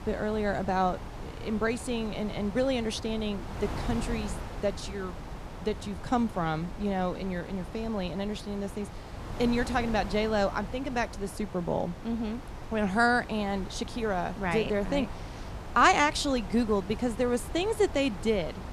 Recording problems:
wind noise on the microphone; occasional gusts; 15 dB below the speech

